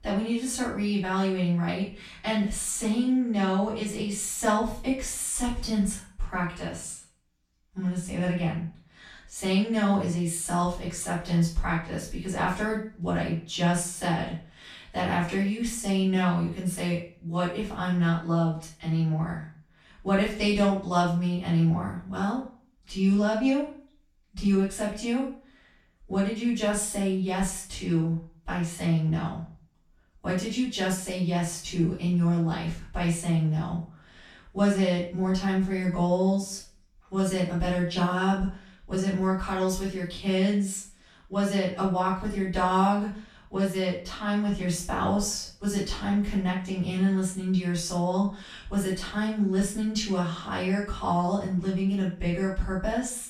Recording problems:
off-mic speech; far
room echo; noticeable; dies away in 0.4 s

